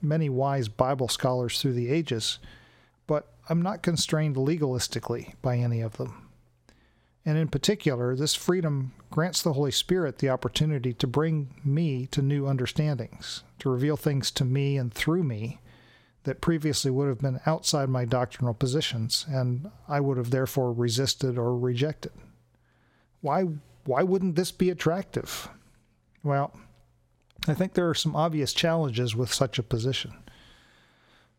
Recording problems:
squashed, flat; somewhat

